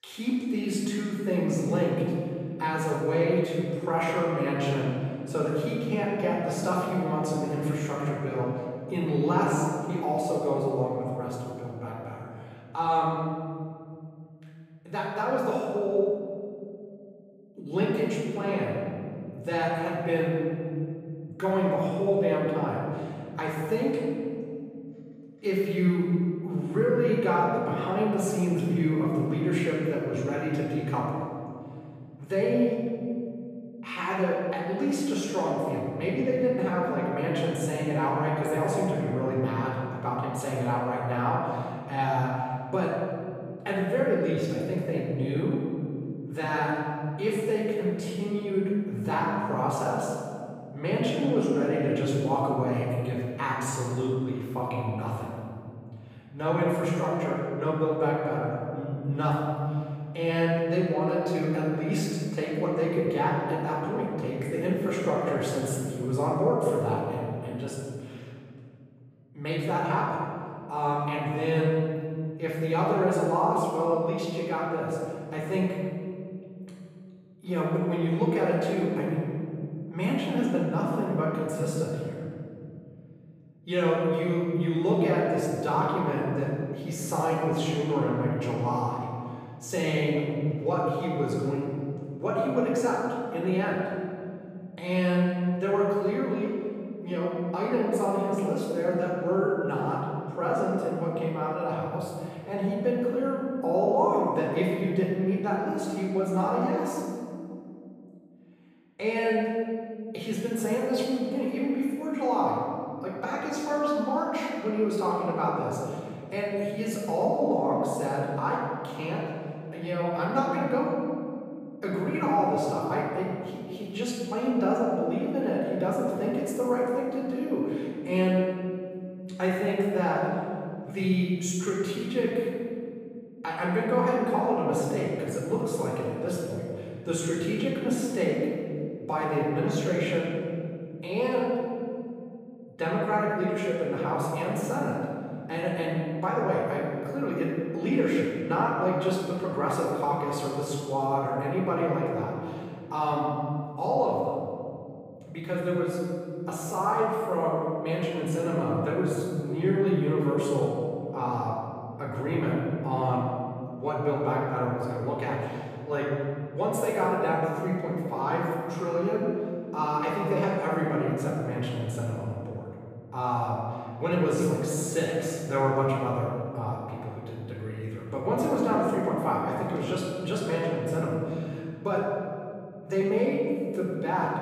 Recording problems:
room echo; strong; dies away in 2.7 s
off-mic speech; far

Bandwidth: 15 kHz